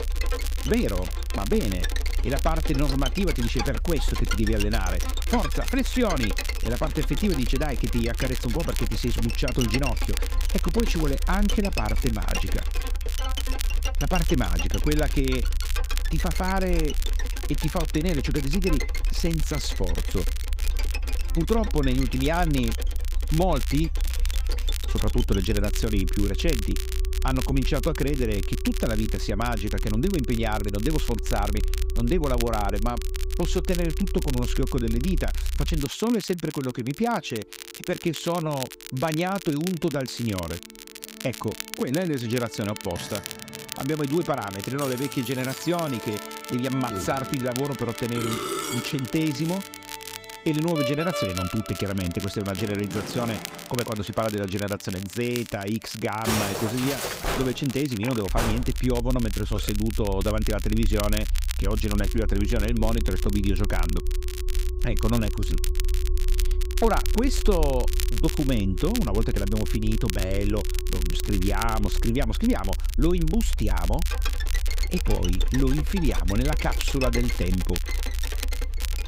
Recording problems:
background music; loud; throughout; 9 dB below the speech
crackle, like an old record; noticeable; 10 dB below the speech
low rumble; faint; until 36 s and from 58 s on; 25 dB below the speech

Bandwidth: 15.5 kHz